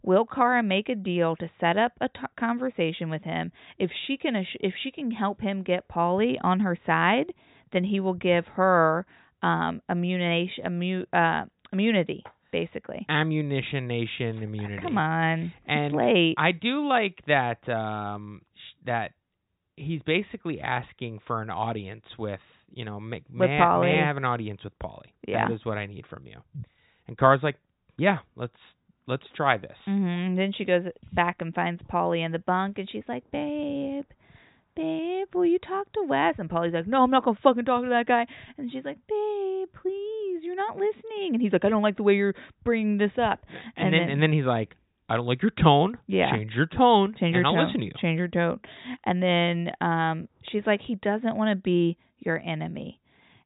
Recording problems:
high frequencies cut off; severe; nothing above 4 kHz

